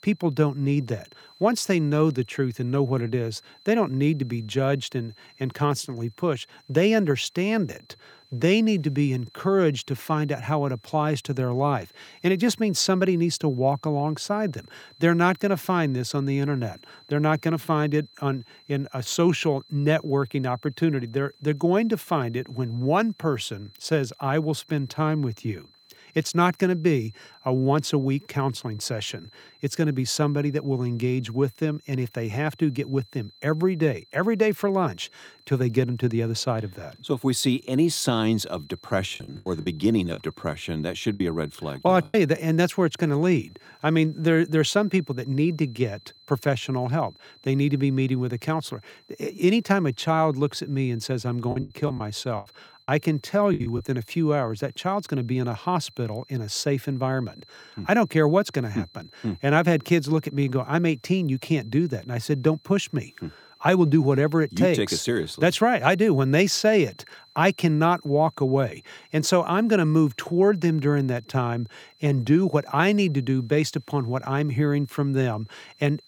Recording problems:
high-pitched whine; faint; throughout; 4 kHz, 30 dB below the speech
choppy; very; from 39 to 42 s and from 52 to 54 s; 14% of the speech affected

